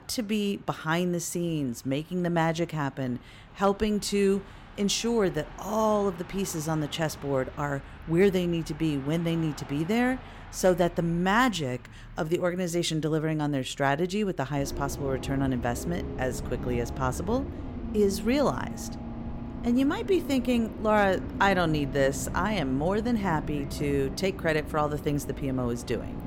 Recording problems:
traffic noise; noticeable; throughout; 10 dB below the speech

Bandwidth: 16.5 kHz